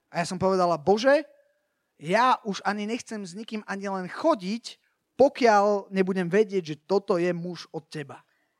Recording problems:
none

